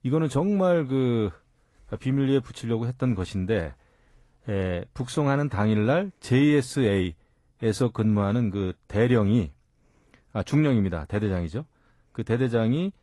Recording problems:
garbled, watery; slightly; nothing above 11.5 kHz

